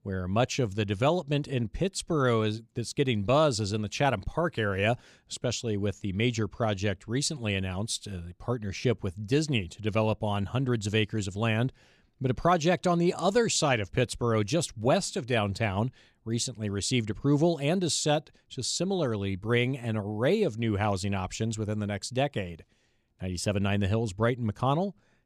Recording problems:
none

